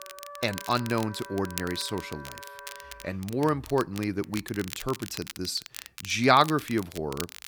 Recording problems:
background music; noticeable; throughout; 15 dB below the speech
crackle, like an old record; noticeable; 15 dB below the speech

